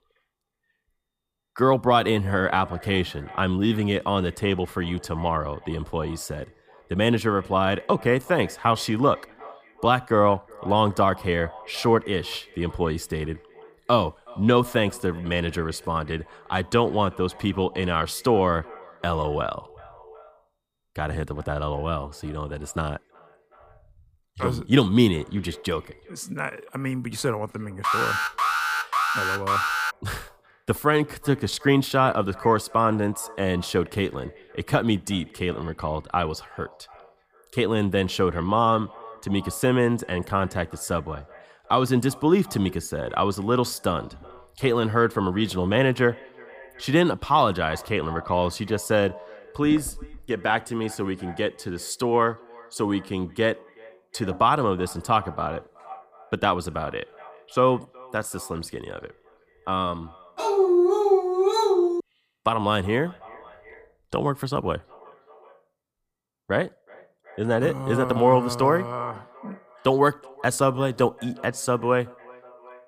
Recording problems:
echo of what is said; faint; throughout; 370 ms later, 20 dB below the speech
alarm; loud; from 28 to 30 s; peak 2 dB above the speech
dog barking; loud; from 1:00 to 1:02; peak 6 dB above the speech

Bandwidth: 15 kHz